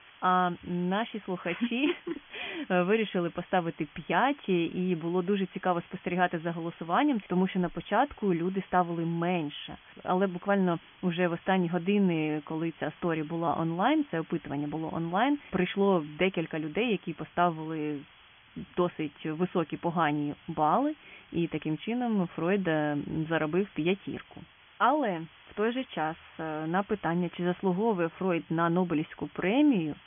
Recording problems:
high frequencies cut off; severe; nothing above 3.5 kHz
hiss; faint; throughout; 25 dB below the speech

